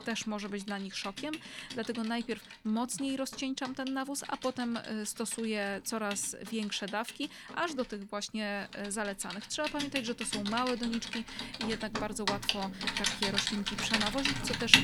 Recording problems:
household noises; very loud; throughout; 1 dB above the speech

